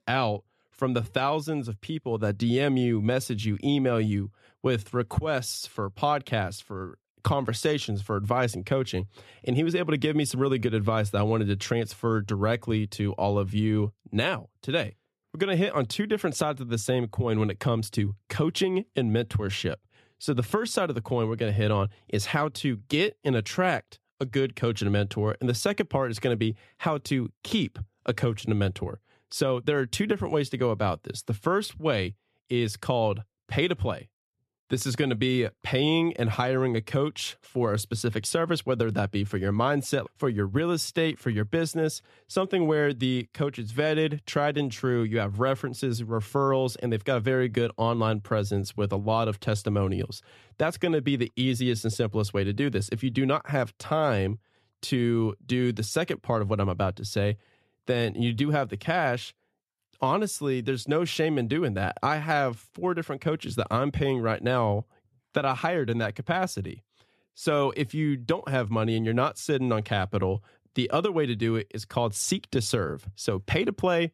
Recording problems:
none

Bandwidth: 13.5 kHz